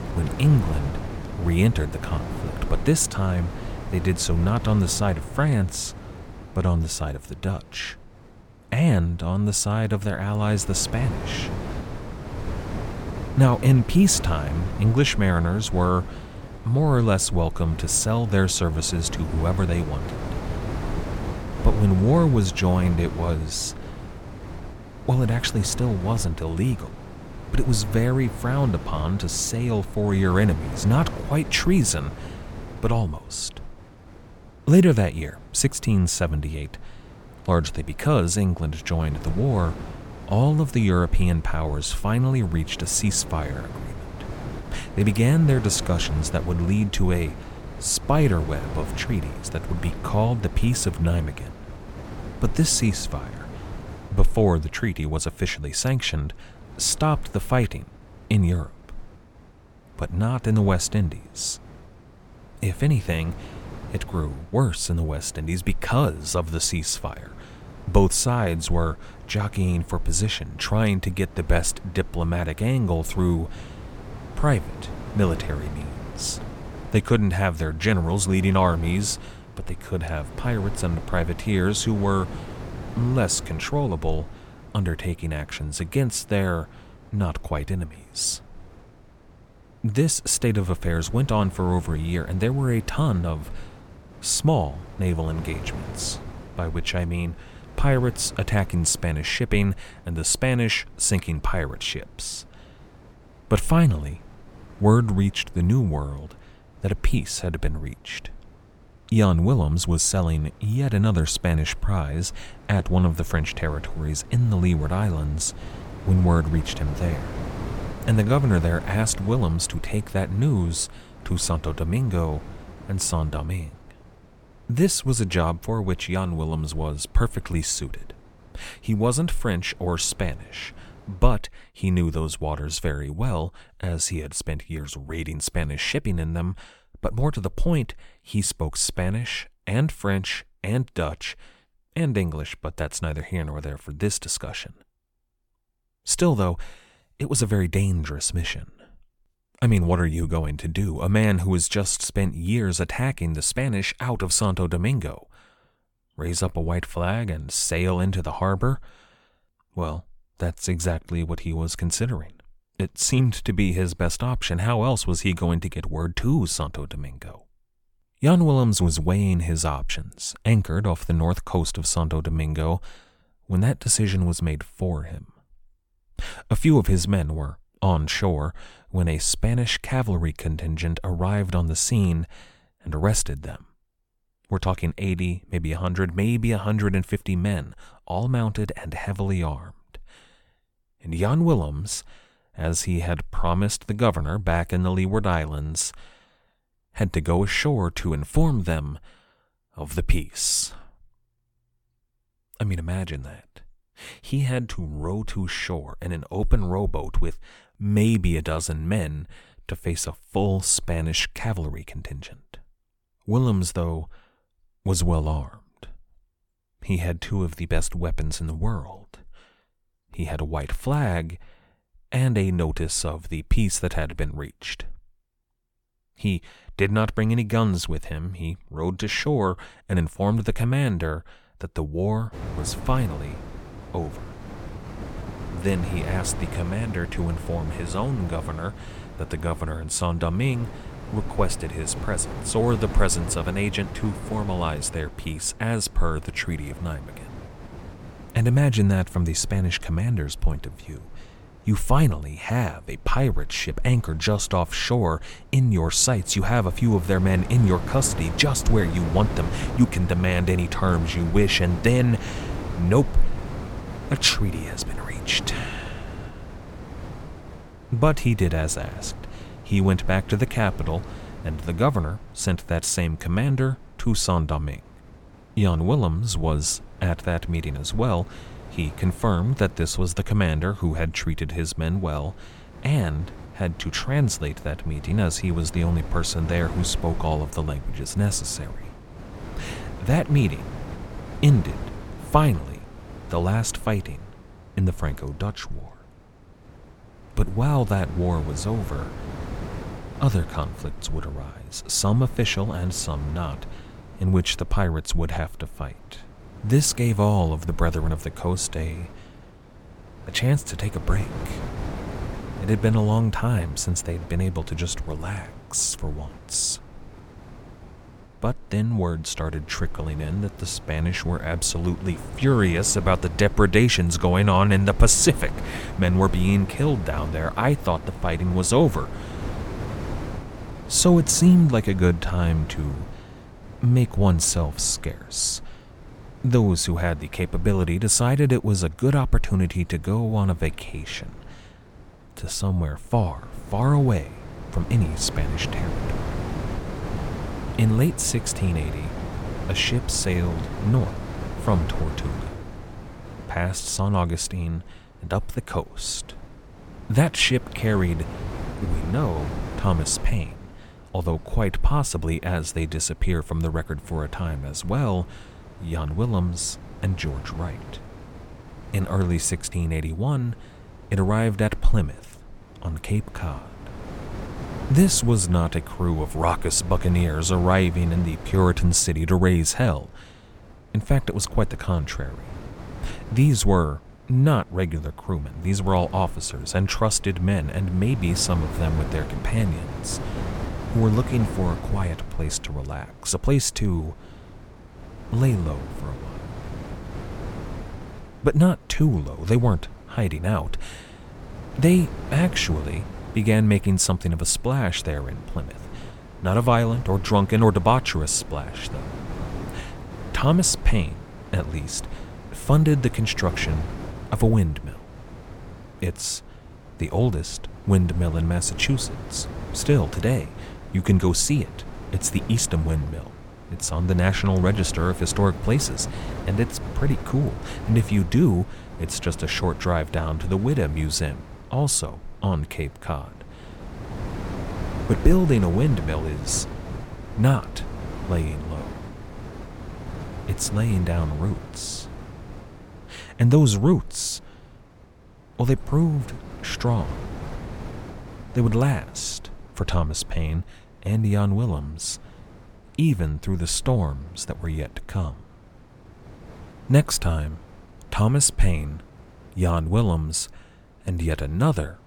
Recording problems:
wind noise on the microphone; occasional gusts; until 2:11 and from 3:52 on; 15 dB below the speech

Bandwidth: 17.5 kHz